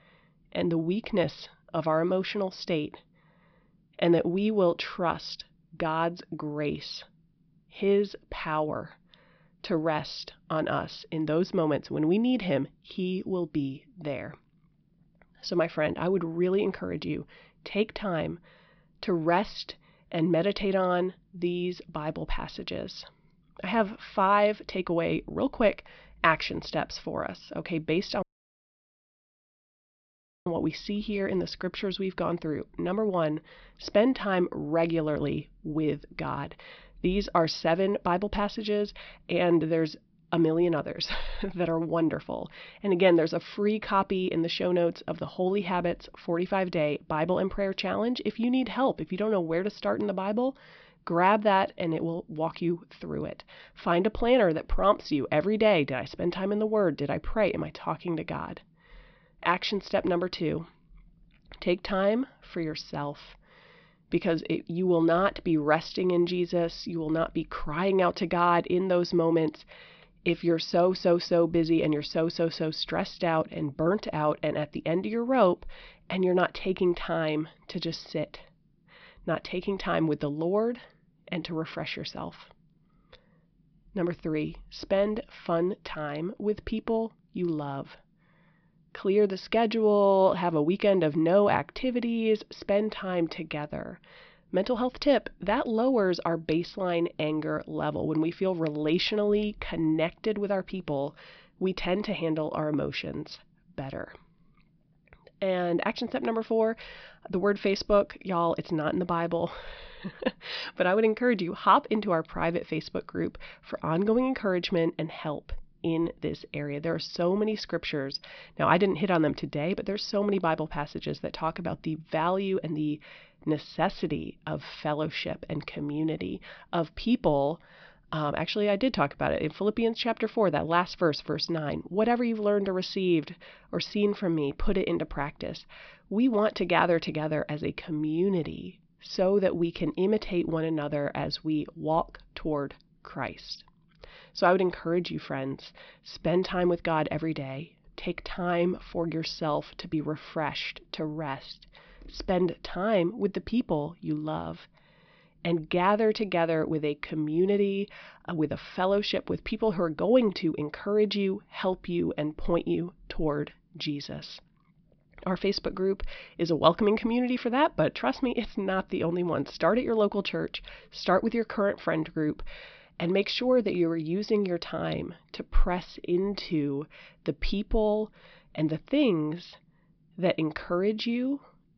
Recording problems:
high frequencies cut off; noticeable; nothing above 5.5 kHz
audio cutting out; at 28 s for 2 s

